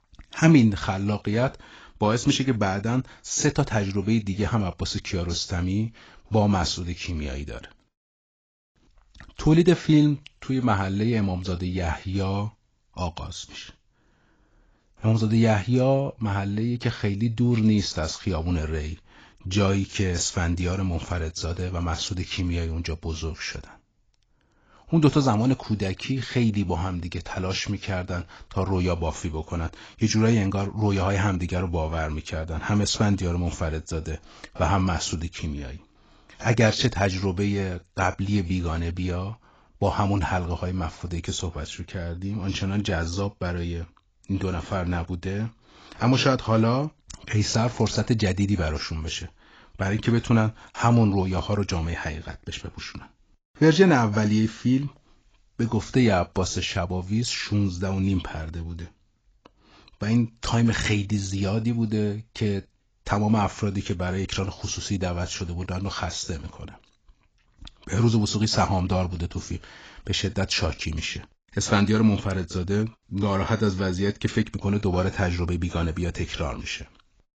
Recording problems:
garbled, watery; badly; nothing above 7.5 kHz

